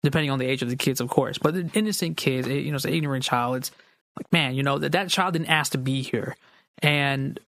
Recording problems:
squashed, flat; somewhat

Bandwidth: 15 kHz